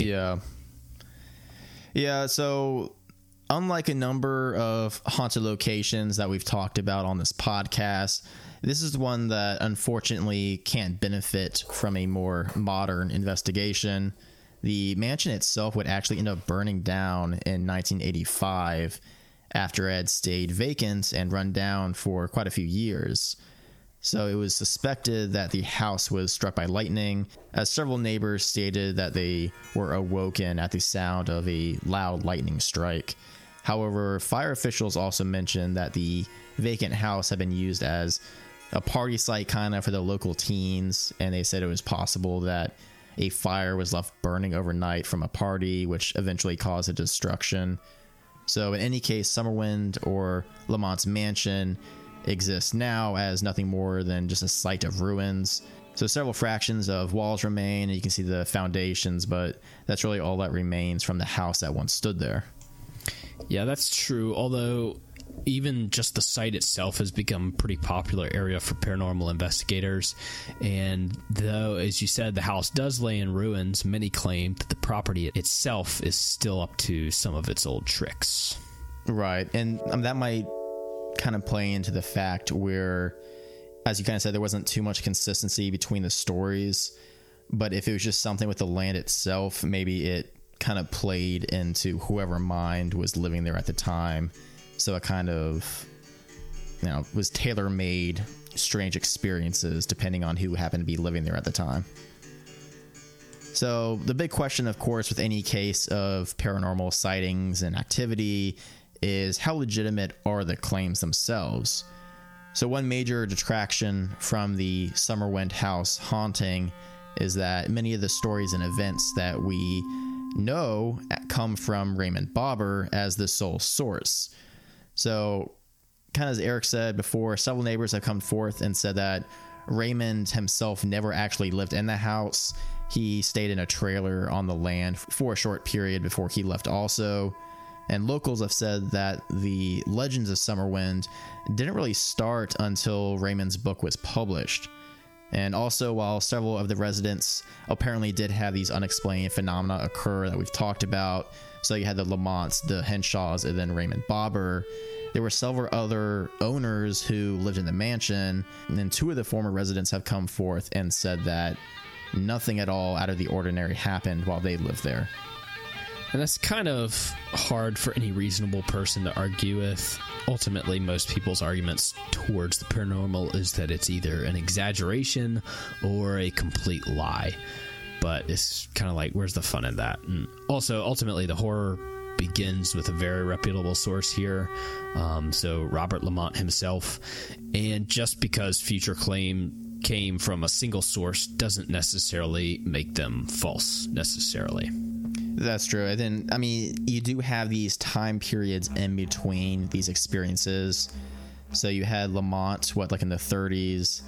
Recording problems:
squashed, flat; heavily, background pumping
background music; noticeable; throughout; 15 dB below the speech
abrupt cut into speech; at the start

